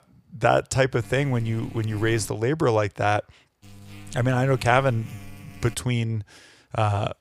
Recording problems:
electrical hum; faint; from 1 to 2.5 s and from 3.5 to 5.5 s; 50 Hz, 25 dB below the speech

